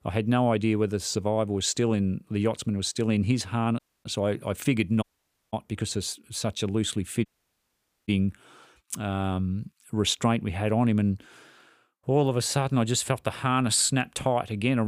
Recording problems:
audio cutting out; at 4 s, at 5 s and at 7.5 s for 1 s
abrupt cut into speech; at the end

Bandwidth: 15 kHz